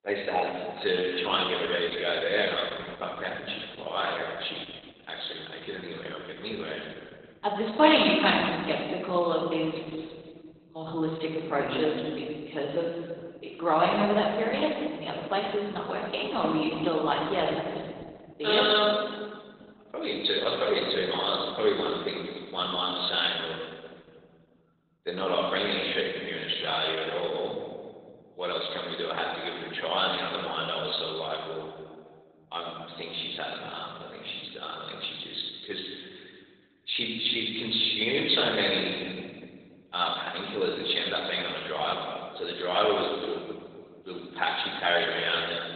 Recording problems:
garbled, watery; badly; nothing above 4 kHz
room echo; noticeable; dies away in 1.8 s
thin; somewhat; fading below 300 Hz
off-mic speech; somewhat distant

